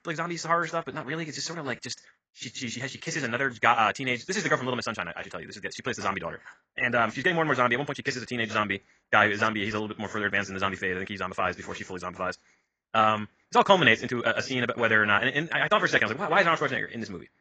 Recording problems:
garbled, watery; badly; nothing above 7.5 kHz
wrong speed, natural pitch; too fast; 1.8 times normal speed

